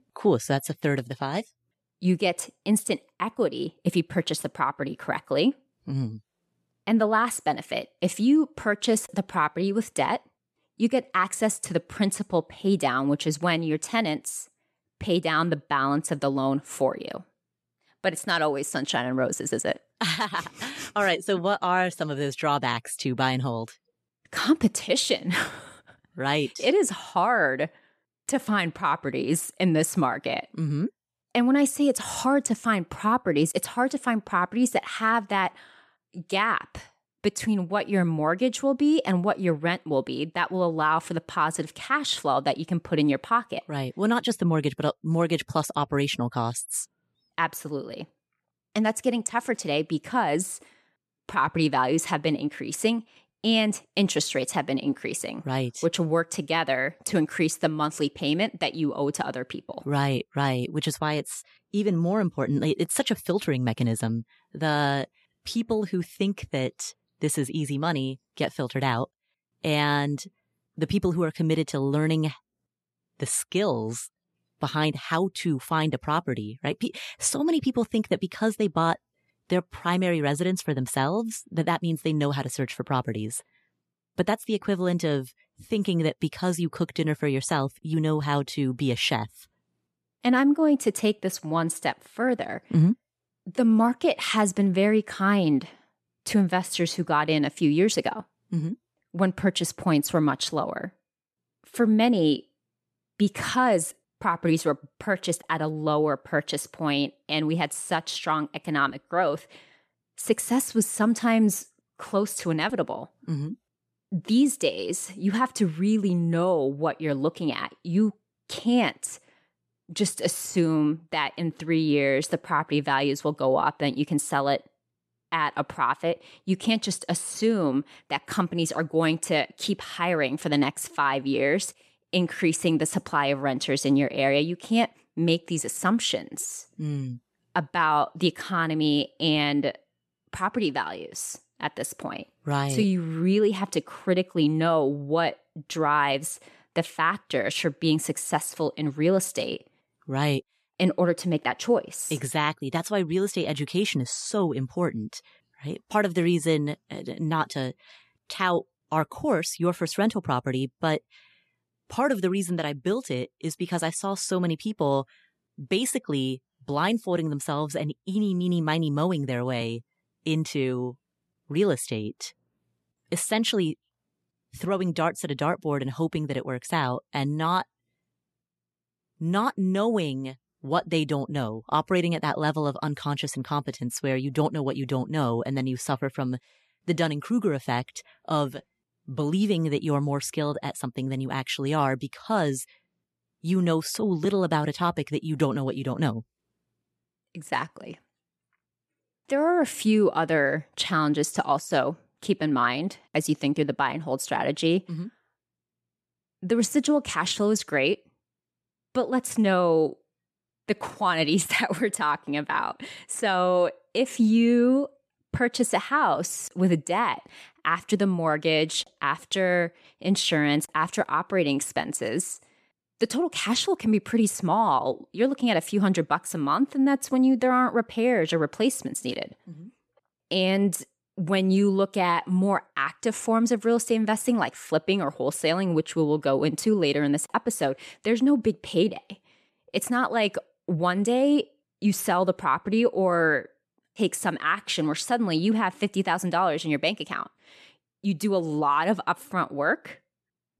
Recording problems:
none

